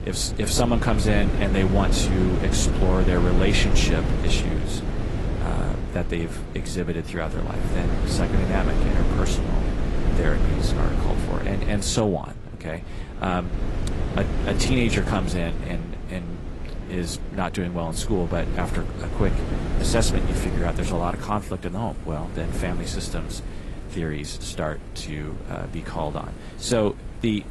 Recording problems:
garbled, watery; slightly; nothing above 11.5 kHz
wind noise on the microphone; heavy; 6 dB below the speech
rain or running water; faint; throughout; 25 dB below the speech

